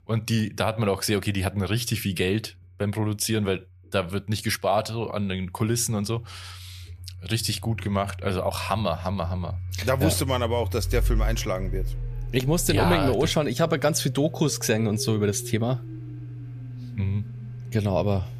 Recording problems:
household noises; loud; throughout; 9 dB below the speech

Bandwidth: 14.5 kHz